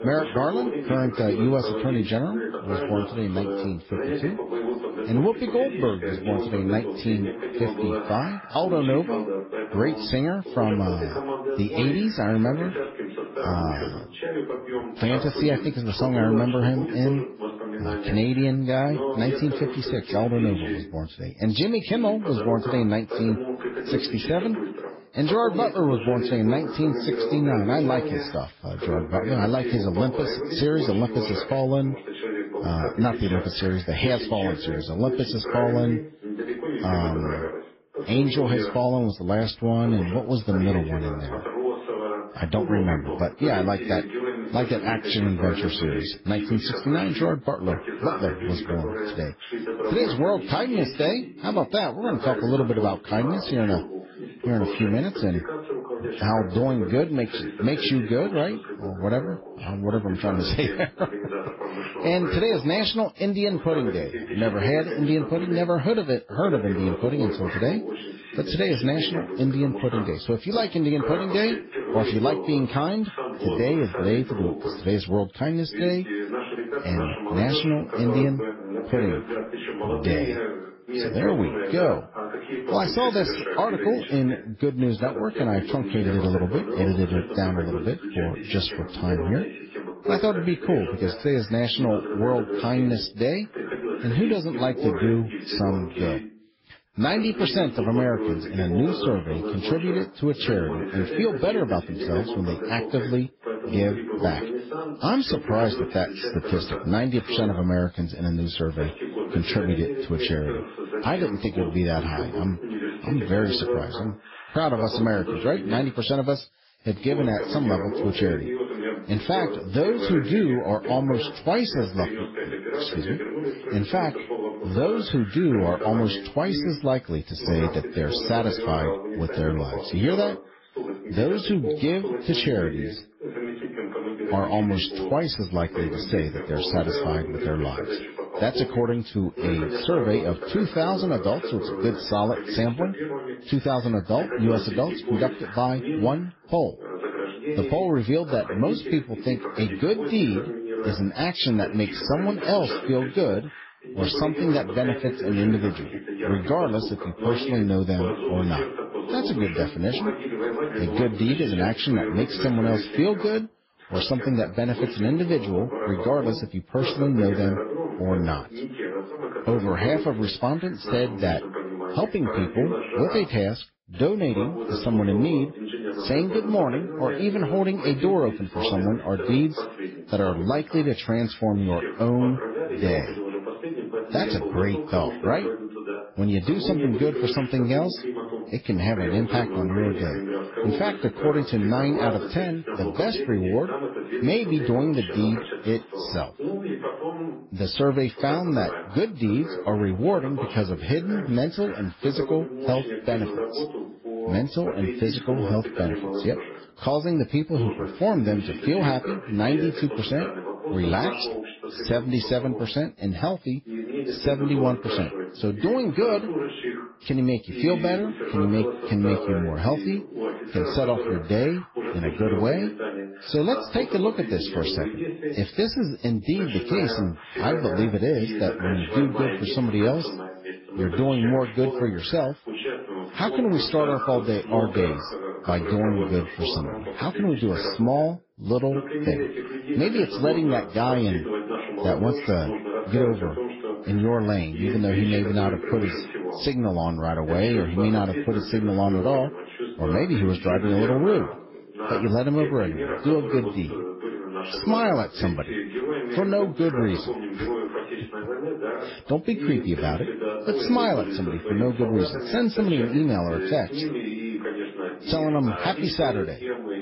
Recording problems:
garbled, watery; badly; nothing above 5.5 kHz
voice in the background; loud; throughout; 6 dB below the speech

